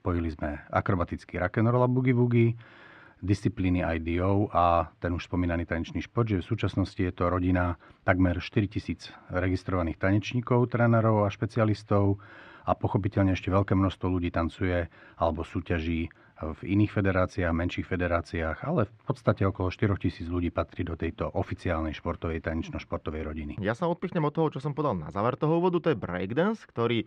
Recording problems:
muffled; slightly; fading above 2 kHz

